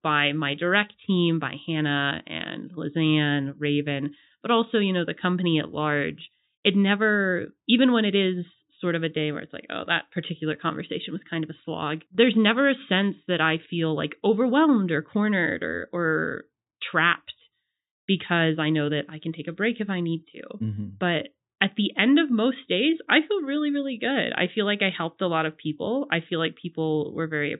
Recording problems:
high frequencies cut off; severe; nothing above 4 kHz

